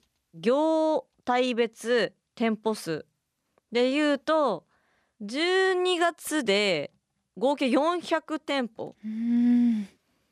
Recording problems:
none

